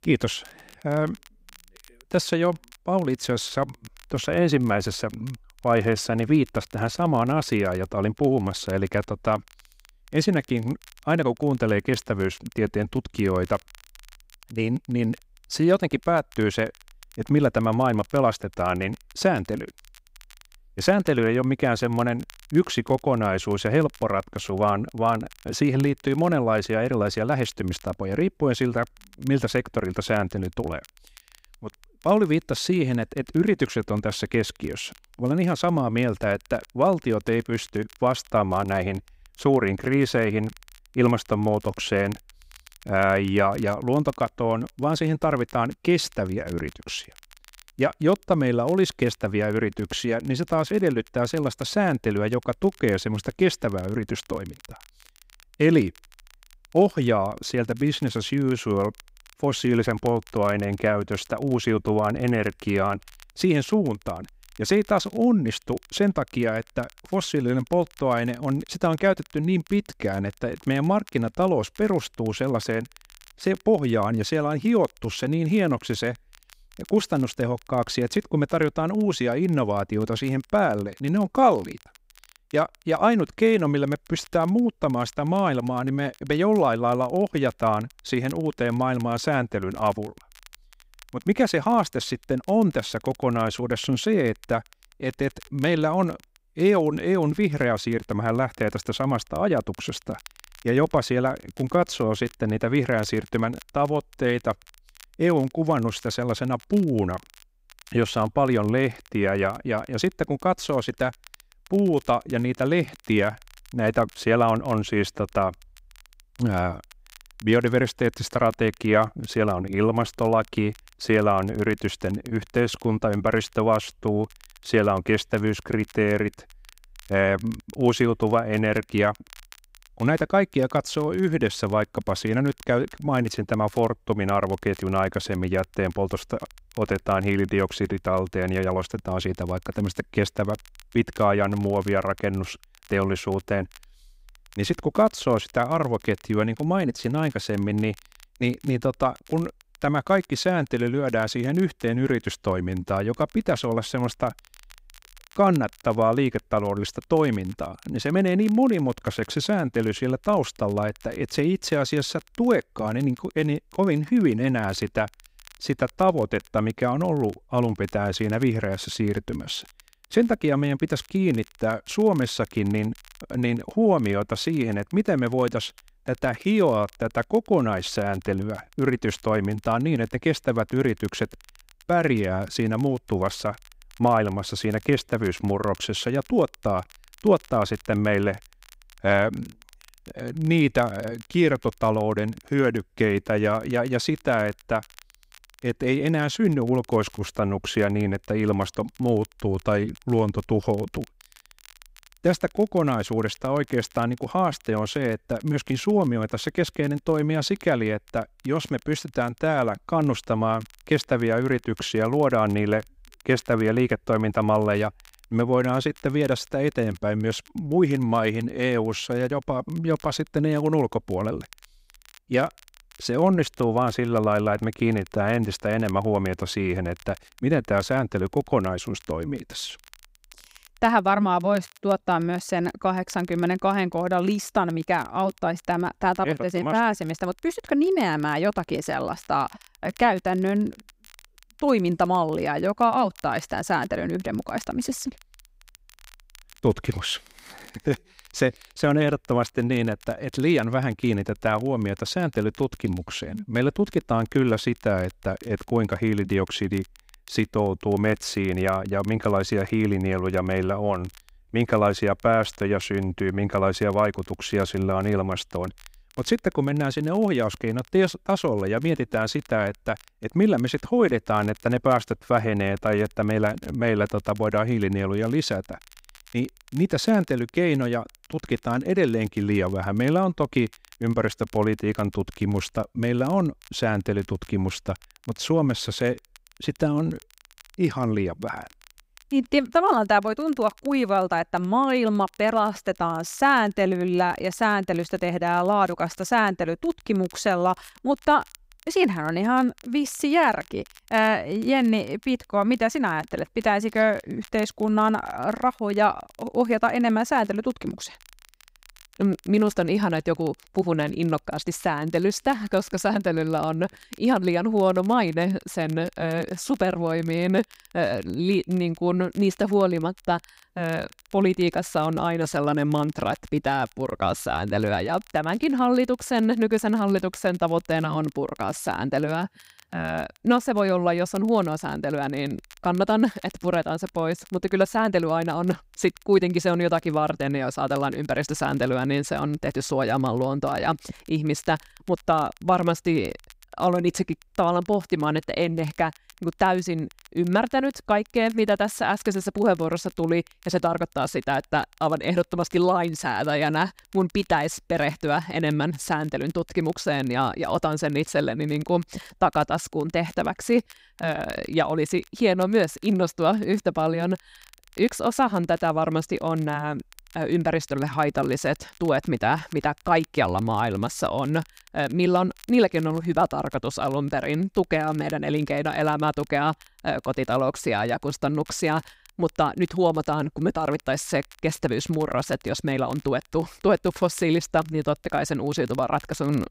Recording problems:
crackle, like an old record; faint; 25 dB below the speech

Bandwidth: 15.5 kHz